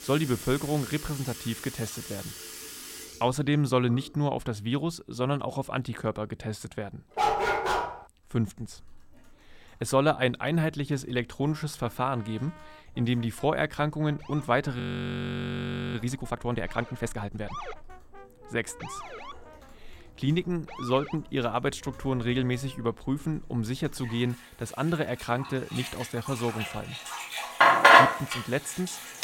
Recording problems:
household noises; very loud; throughout; 4 dB above the speech
background music; faint; throughout; 25 dB below the speech
dog barking; loud; at 7 s; peak 5 dB above the speech
siren; noticeable; from 14 to 21 s; peak 9 dB below the speech
audio freezing; at 15 s for 1 s

